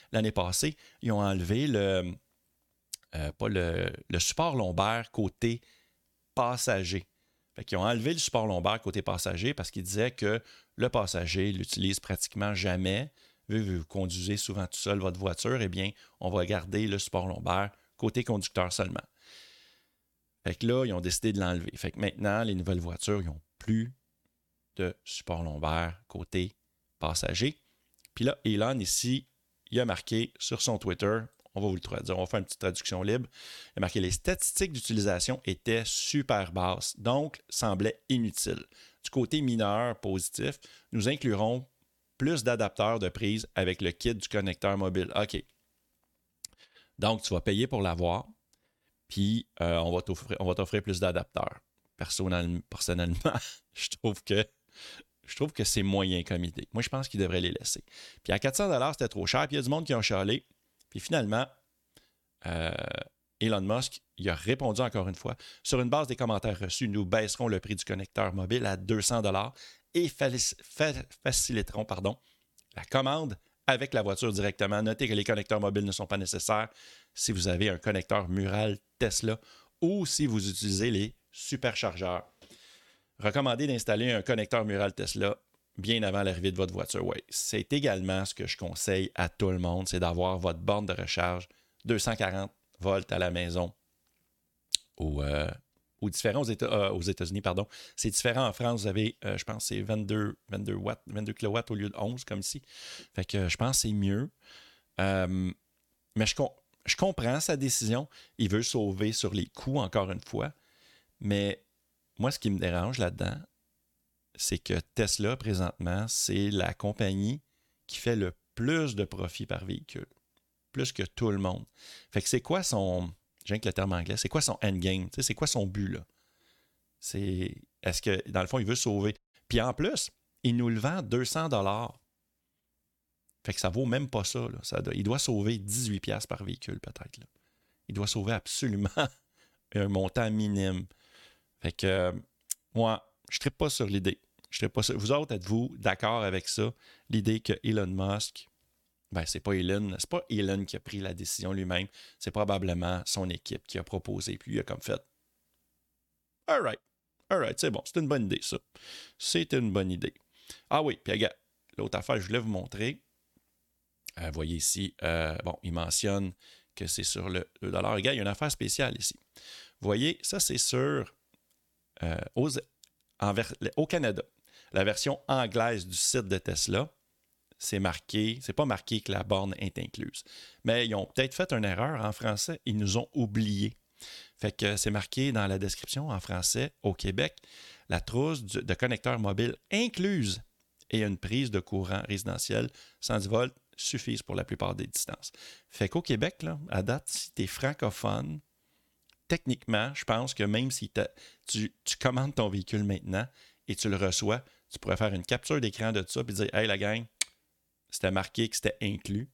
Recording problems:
audio cutting out; at 2:09

